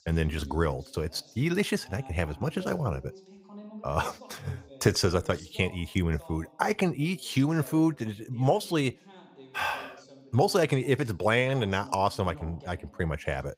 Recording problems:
voice in the background; faint; throughout; 20 dB below the speech

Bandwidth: 15.5 kHz